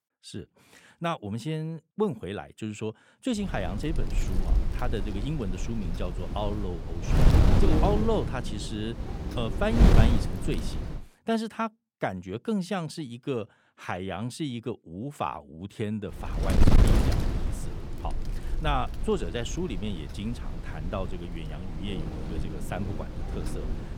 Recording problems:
wind noise on the microphone; heavy; from 3.5 to 11 s and from 16 s on; 3 dB below the speech

